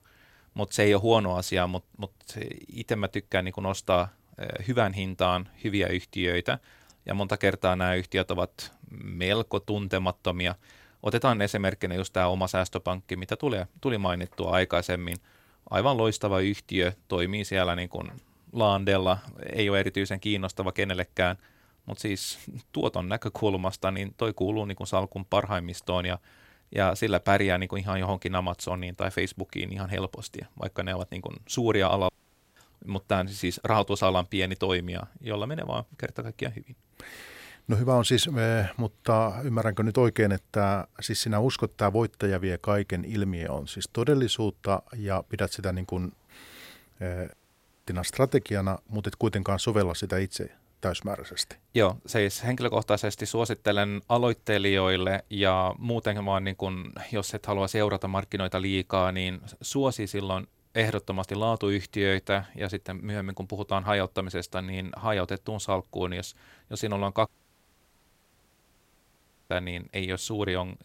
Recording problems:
audio cutting out; at 32 s, at 47 s for 0.5 s and at 1:07 for 2 s

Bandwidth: 16 kHz